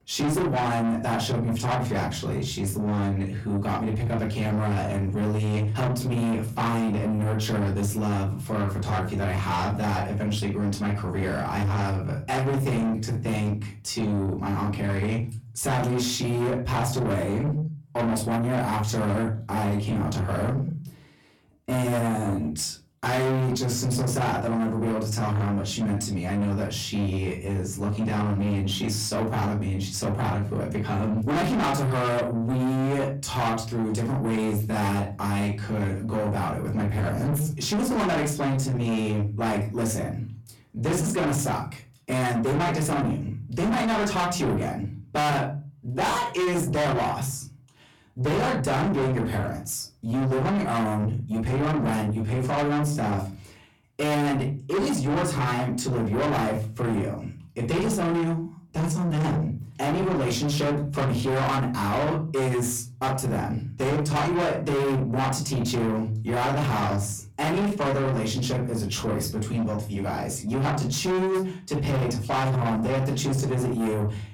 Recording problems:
distortion; heavy; 6 dB below the speech
off-mic speech; far
room echo; very slight; dies away in 0.4 s

